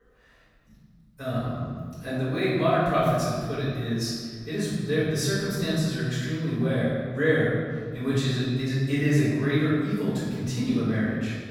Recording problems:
room echo; strong; dies away in 1.6 s
off-mic speech; far

